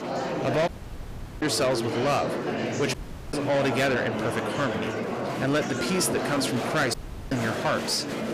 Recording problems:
distortion; heavy; 7 dB below the speech
murmuring crowd; loud; throughout; 3 dB below the speech
audio cutting out; at 0.5 s for 0.5 s, at 3 s and at 7 s

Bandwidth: 15 kHz